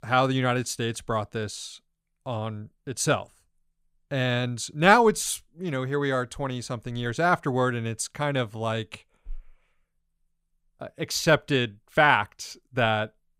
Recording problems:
none

